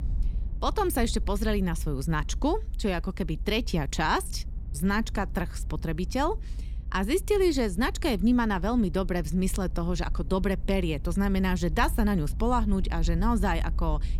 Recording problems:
low rumble; faint; throughout; 25 dB below the speech

